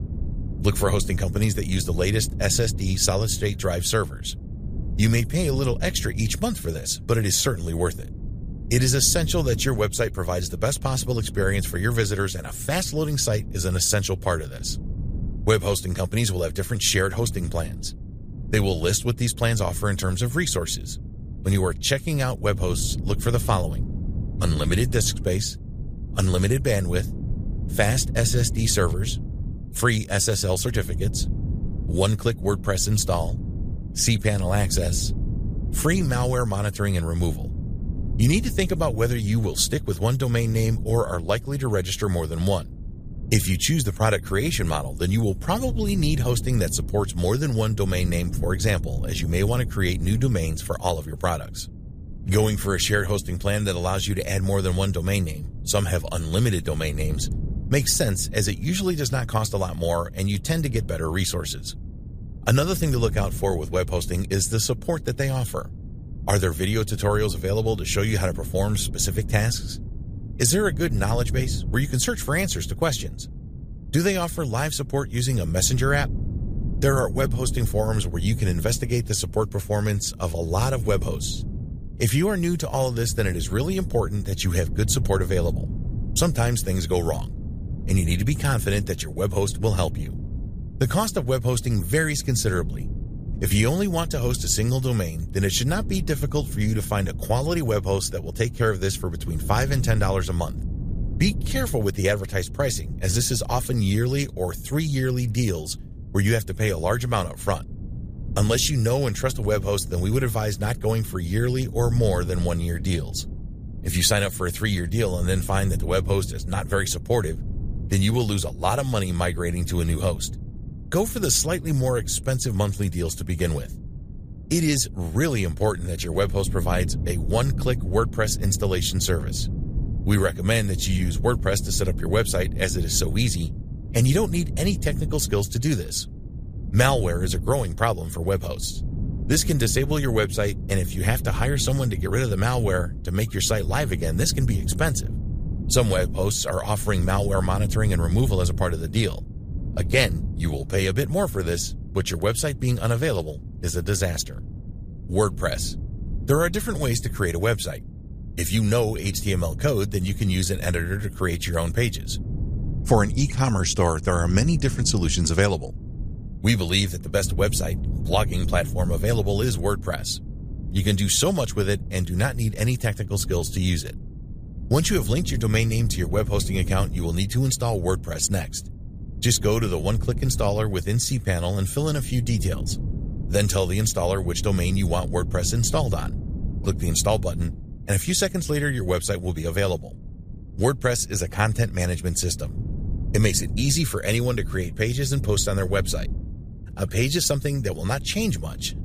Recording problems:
wind noise on the microphone; occasional gusts; 20 dB below the speech

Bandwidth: 15 kHz